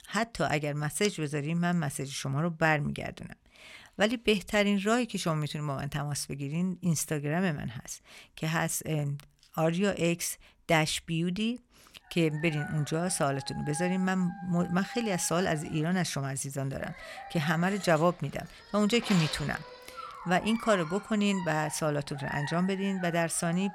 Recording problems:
animal sounds; noticeable; from 12 s on; 15 dB below the speech

